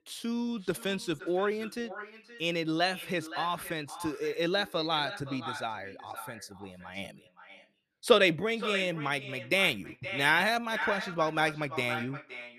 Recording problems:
echo of what is said; strong; throughout; 520 ms later, 10 dB below the speech

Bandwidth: 14.5 kHz